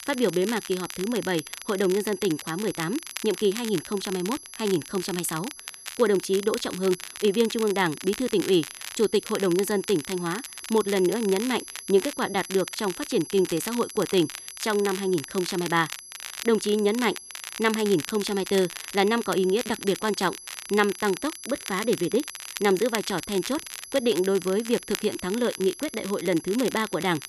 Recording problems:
high-pitched whine; noticeable; throughout; 11 kHz, 15 dB below the speech
crackle, like an old record; noticeable; 10 dB below the speech

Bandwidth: 13.5 kHz